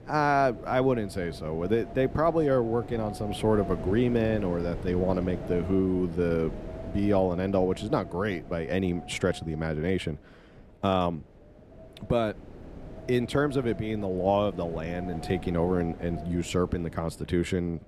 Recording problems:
wind noise on the microphone; occasional gusts; 15 dB below the speech

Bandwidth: 14.5 kHz